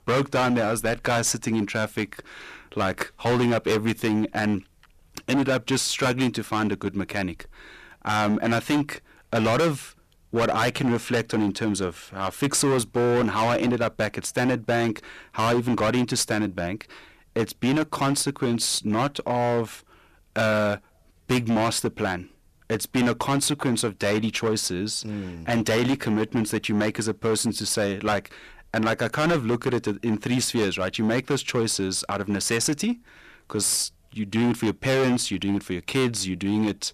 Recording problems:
distortion; heavy; 14% of the sound clipped

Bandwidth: 14.5 kHz